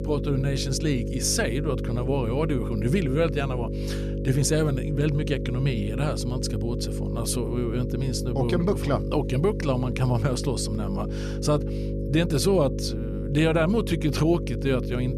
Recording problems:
electrical hum; loud; throughout; 50 Hz, 8 dB below the speech

